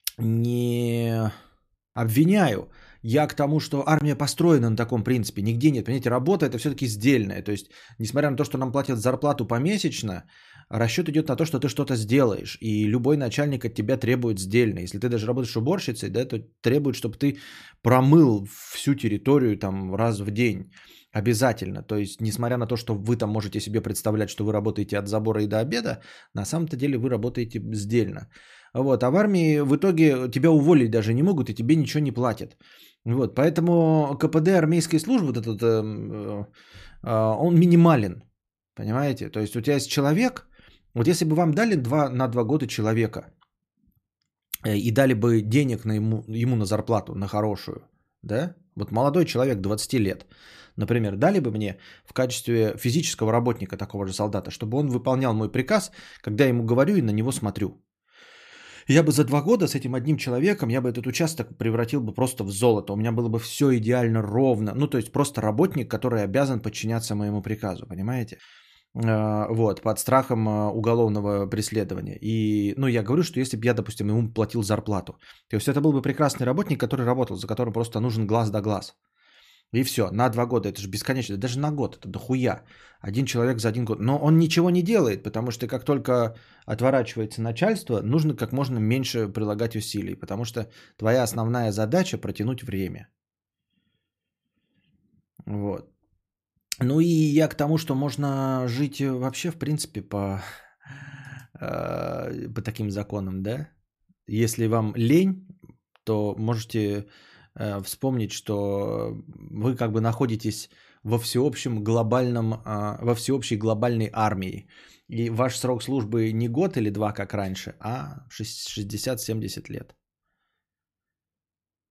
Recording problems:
none

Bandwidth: 14.5 kHz